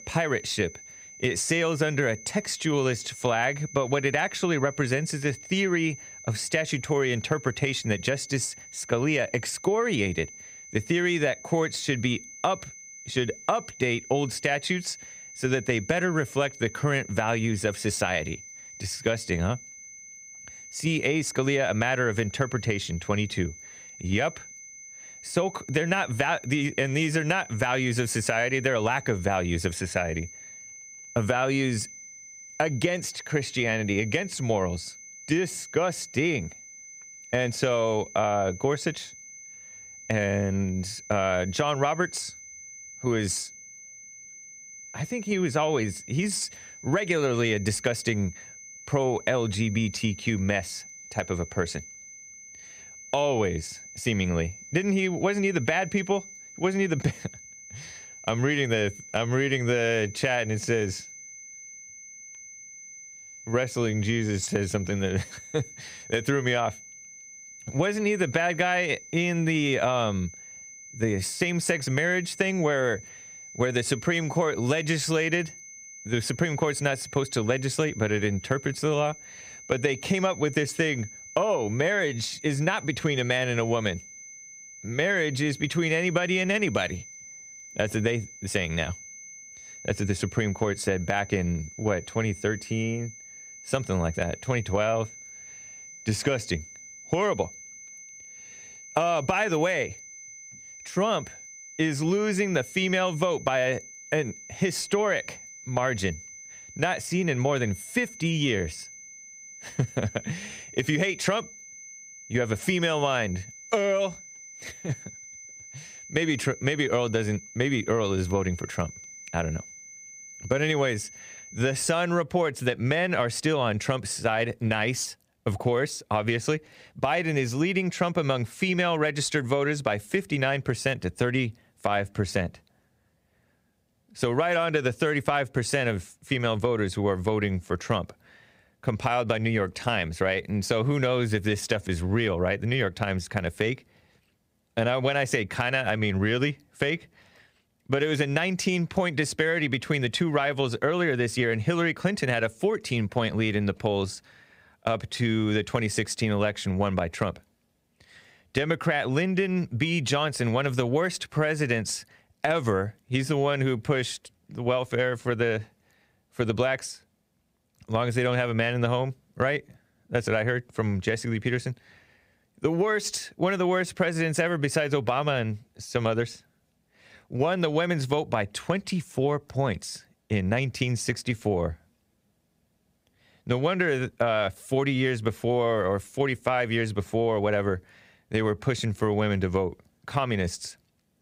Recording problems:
high-pitched whine; noticeable; until 2:02; 6 kHz, 15 dB below the speech

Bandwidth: 15.5 kHz